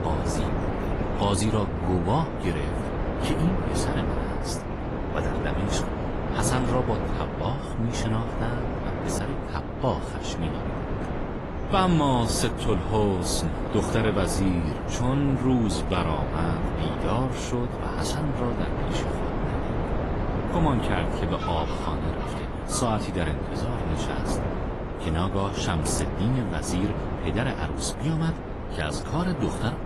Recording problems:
garbled, watery; slightly; nothing above 11.5 kHz
wind noise on the microphone; heavy; 3 dB below the speech
animal sounds; faint; throughout; 20 dB below the speech

